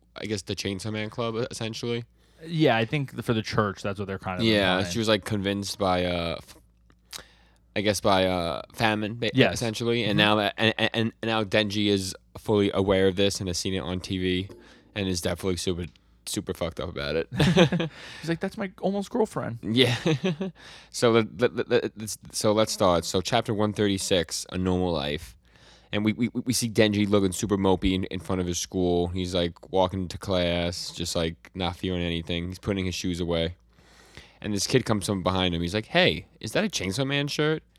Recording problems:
none

